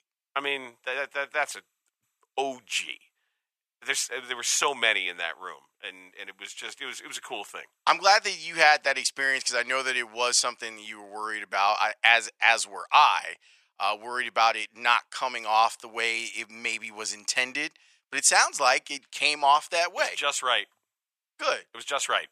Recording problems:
thin; very; fading below 850 Hz

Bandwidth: 14.5 kHz